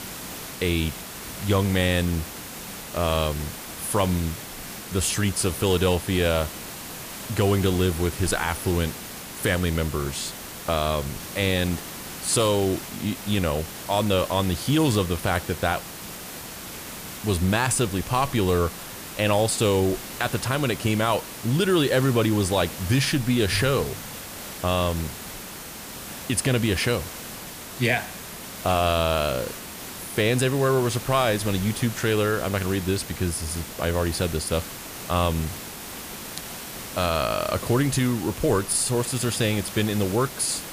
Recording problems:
hiss; noticeable; throughout; 10 dB below the speech

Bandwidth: 15 kHz